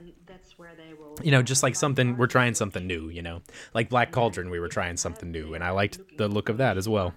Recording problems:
voice in the background; faint; throughout; 25 dB below the speech

